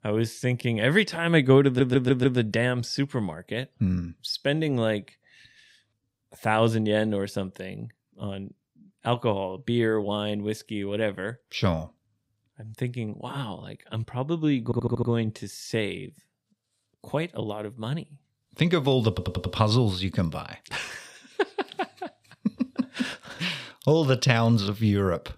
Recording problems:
audio stuttering; at 1.5 s, at 15 s and at 19 s

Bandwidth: 15.5 kHz